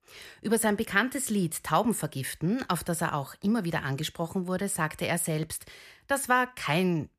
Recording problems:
none

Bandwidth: 14.5 kHz